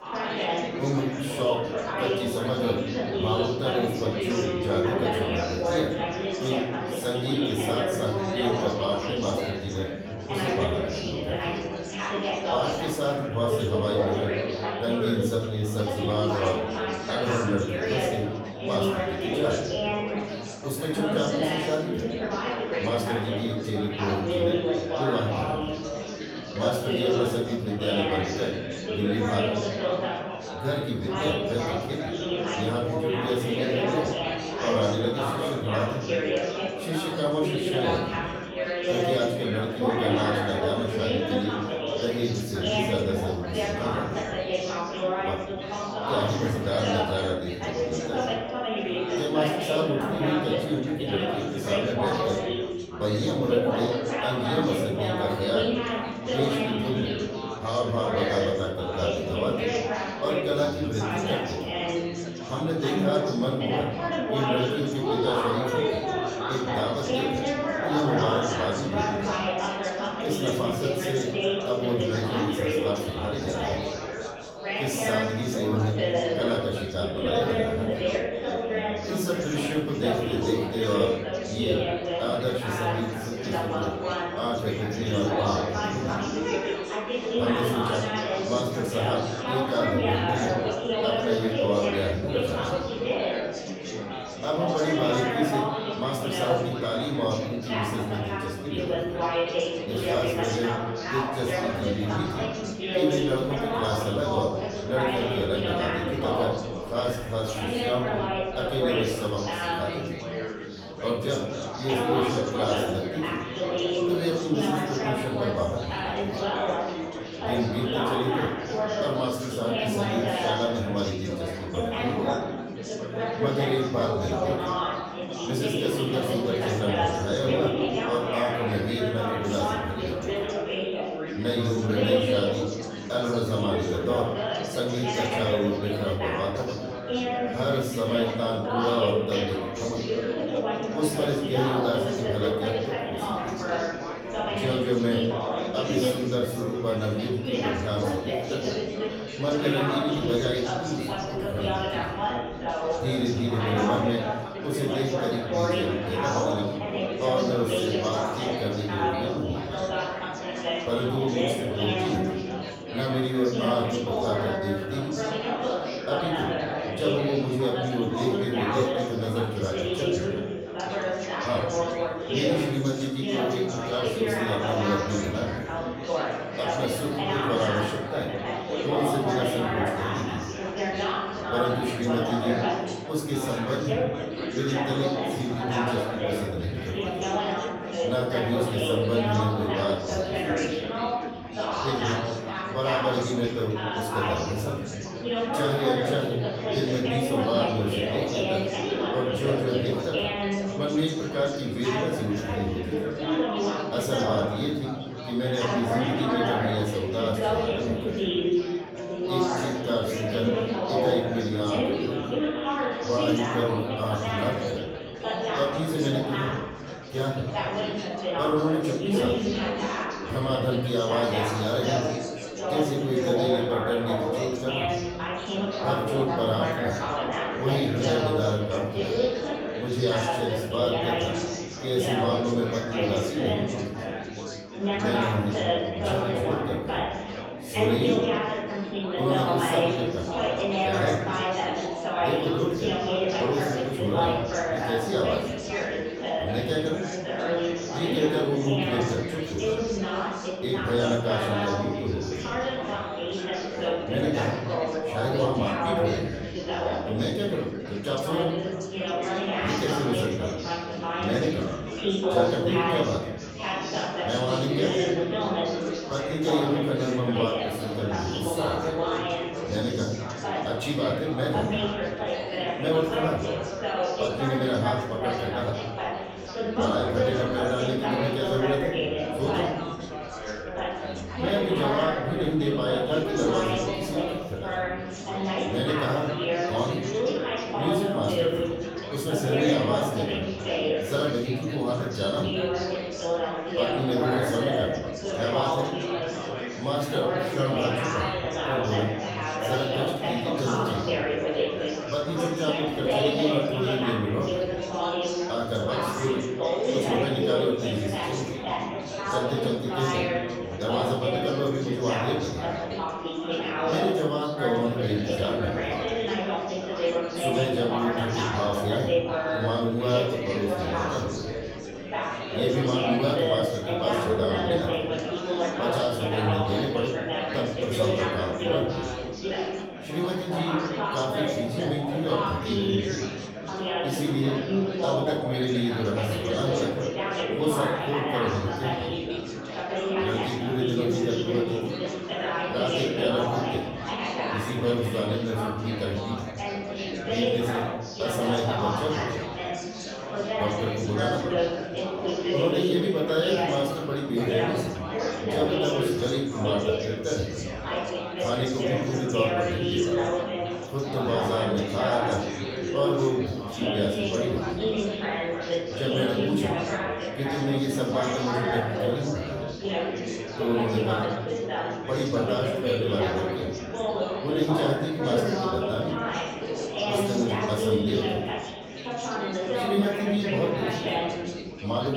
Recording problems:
off-mic speech; far
room echo; noticeable; dies away in 0.7 s
chatter from many people; very loud; throughout; as loud as the speech
abrupt cut into speech; at the end

